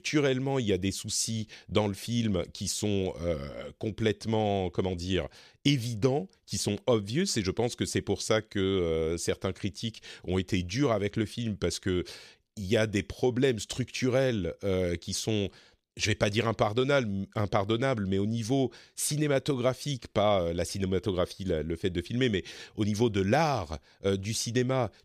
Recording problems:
none

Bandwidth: 14.5 kHz